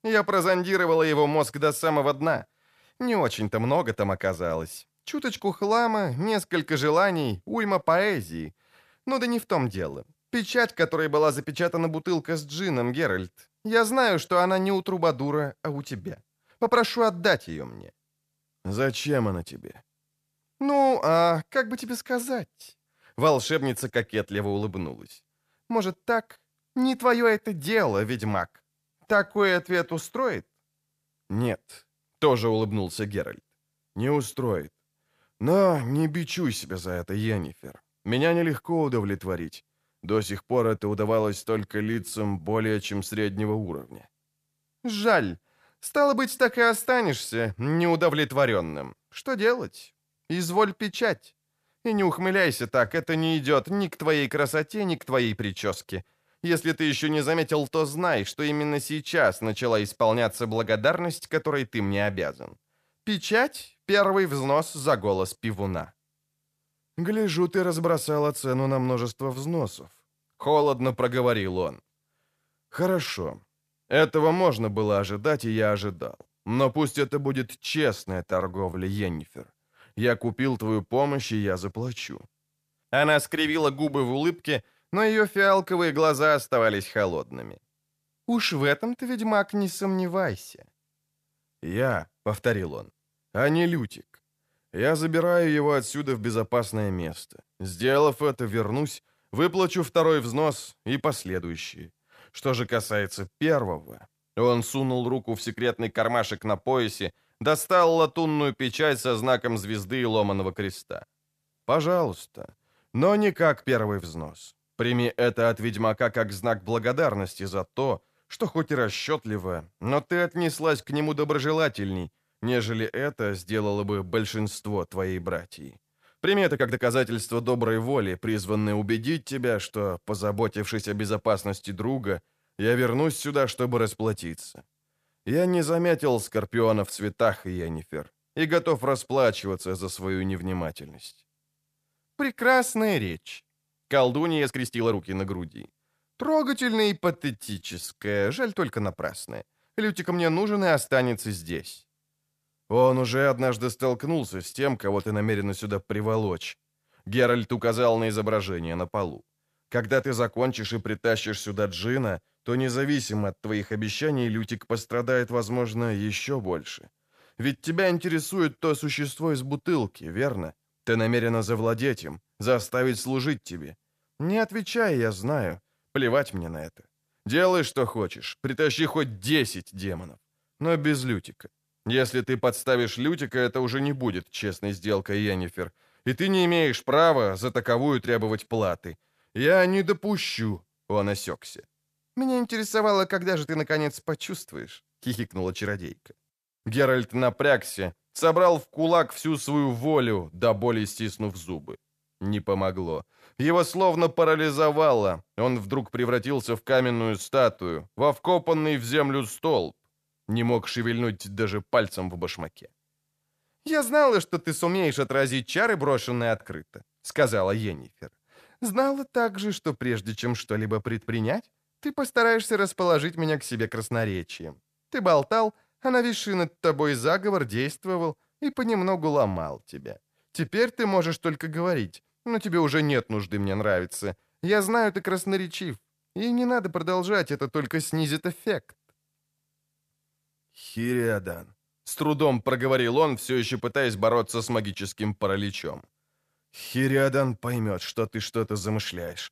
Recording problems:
uneven, jittery; strongly; from 5.5 s to 4:01

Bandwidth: 14.5 kHz